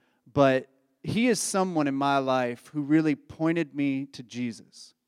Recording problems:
none

